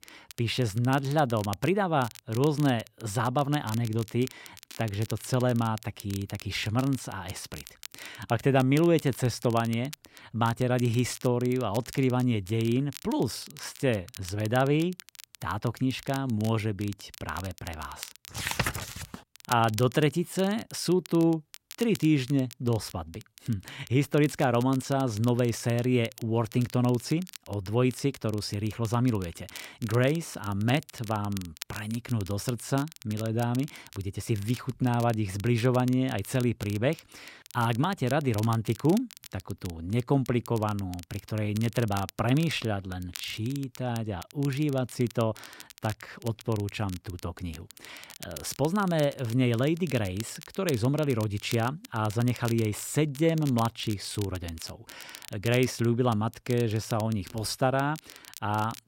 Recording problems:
crackle, like an old record; noticeable; 20 dB below the speech

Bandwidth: 16 kHz